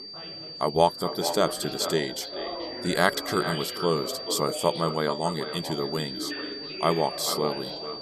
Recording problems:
echo of what is said; strong; throughout; 430 ms later, 10 dB below the speech
high-pitched whine; loud; throughout; 4.5 kHz, 9 dB below the speech
background chatter; noticeable; throughout; 4 voices, 10 dB below the speech

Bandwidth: 14 kHz